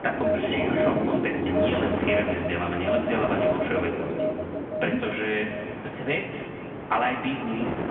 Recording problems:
off-mic speech; far
room echo; noticeable; dies away in 1.9 s
phone-call audio; nothing above 3 kHz
wind noise on the microphone; heavy; 7 dB below the speech
alarms or sirens; loud; throughout; 2 dB below the speech
rain or running water; loud; throughout; 3 dB below the speech

